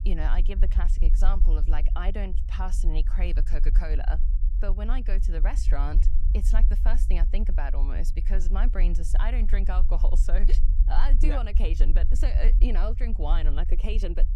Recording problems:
low rumble; noticeable; throughout; 10 dB below the speech

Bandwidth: 16.5 kHz